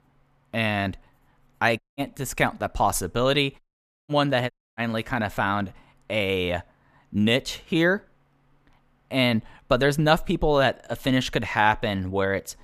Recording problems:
audio cutting out; at 2 s, at 3.5 s and at 4.5 s

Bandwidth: 14.5 kHz